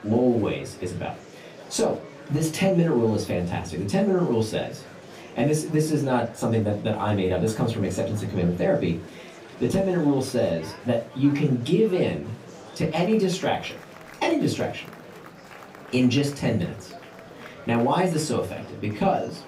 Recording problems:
off-mic speech; far
room echo; very slight; dies away in 0.2 s
murmuring crowd; noticeable; throughout; 20 dB below the speech

